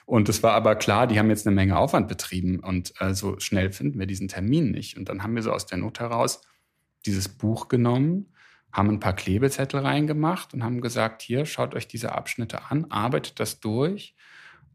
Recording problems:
none

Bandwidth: 14.5 kHz